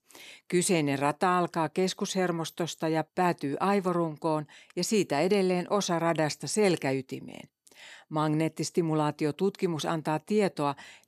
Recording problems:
none

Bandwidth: 13.5 kHz